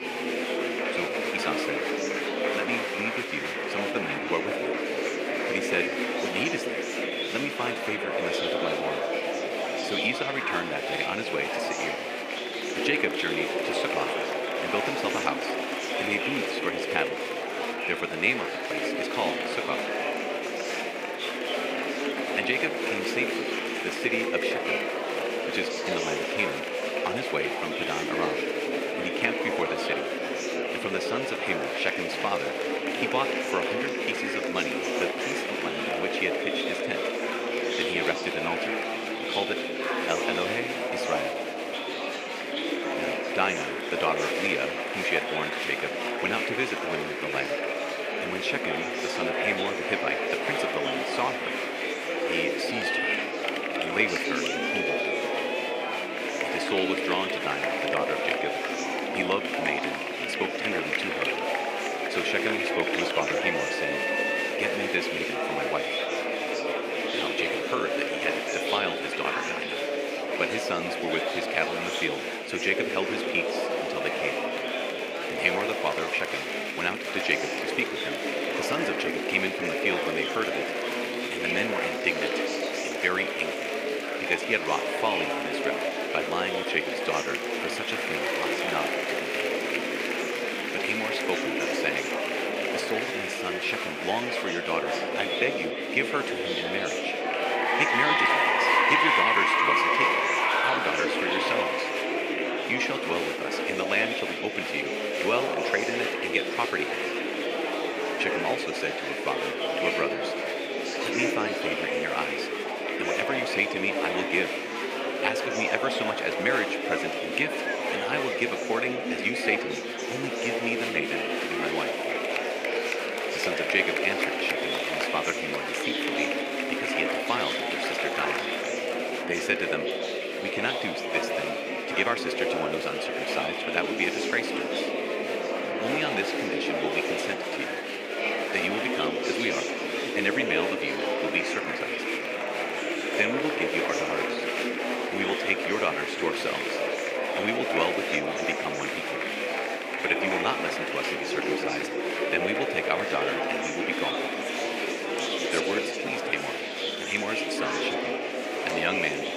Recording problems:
thin; somewhat; fading below 350 Hz
murmuring crowd; very loud; throughout; 3 dB above the speech

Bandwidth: 15.5 kHz